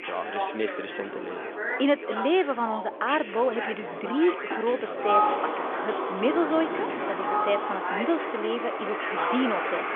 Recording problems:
phone-call audio; nothing above 3.5 kHz
animal sounds; loud; from 5 s on; 1 dB below the speech
background chatter; loud; throughout; 4 voices, 5 dB below the speech
wind noise on the microphone; occasional gusts; 15 dB below the speech

